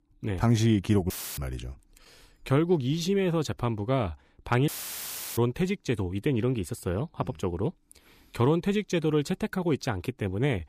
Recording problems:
audio cutting out; filled with static; at 1 s and at 4.5 s for 0.5 s

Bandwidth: 15 kHz